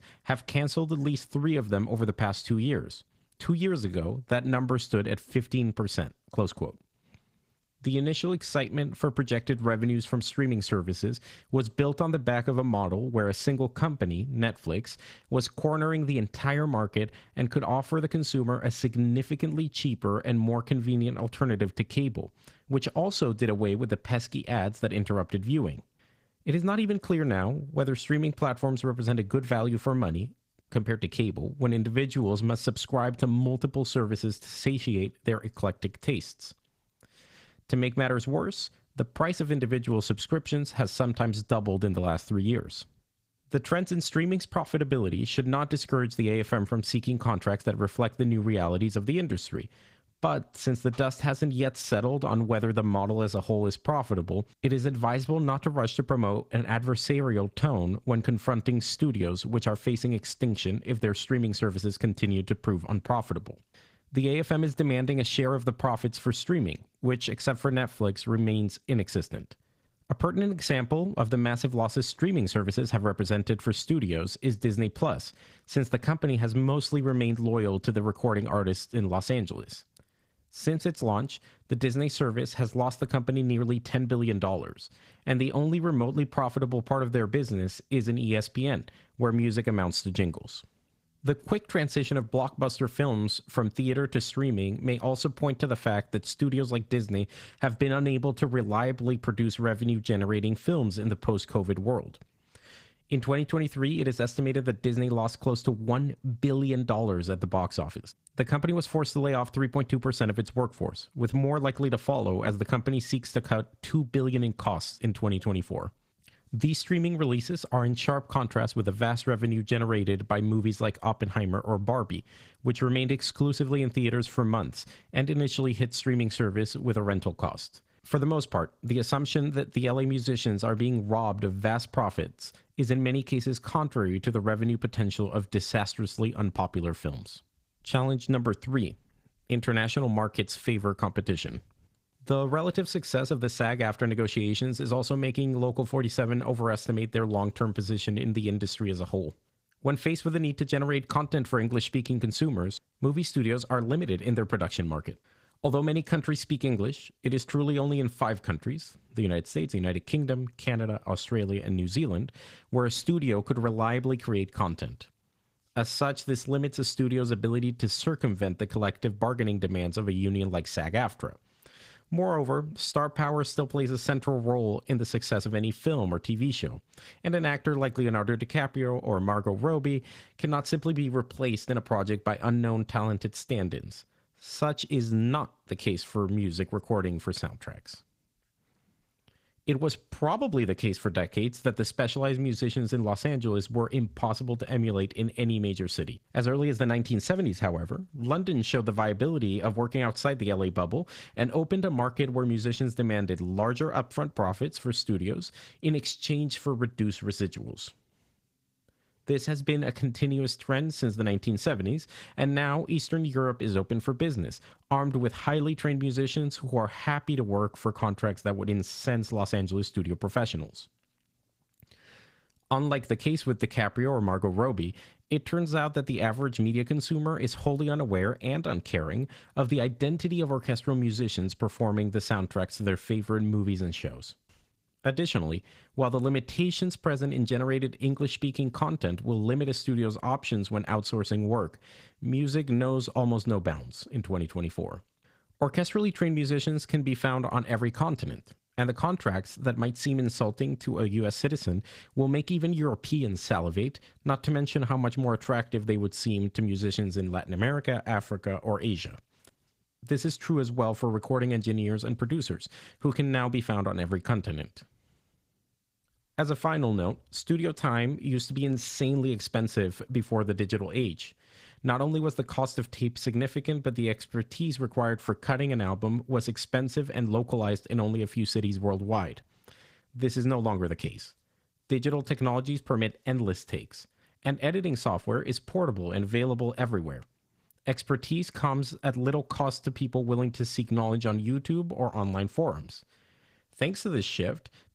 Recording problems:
garbled, watery; slightly; nothing above 15.5 kHz

